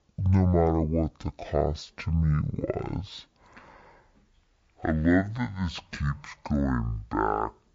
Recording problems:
wrong speed and pitch; too slow and too low; 0.5 times normal speed

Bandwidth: 7.5 kHz